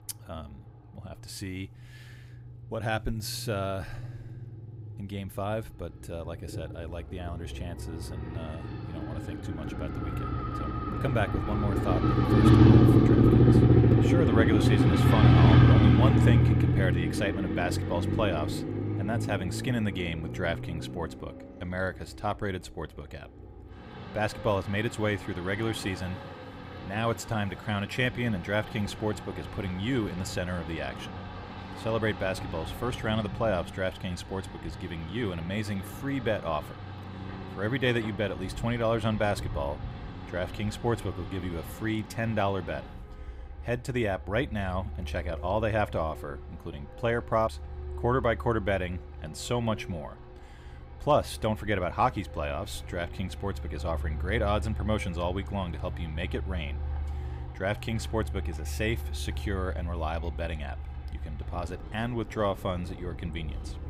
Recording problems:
traffic noise; very loud; throughout; 5 dB above the speech

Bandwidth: 15.5 kHz